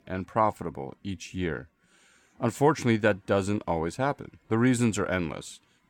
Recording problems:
none

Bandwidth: 18.5 kHz